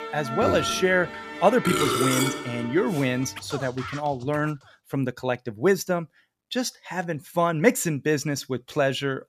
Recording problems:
background music; loud; until 4 s; 4 dB below the speech

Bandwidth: 14.5 kHz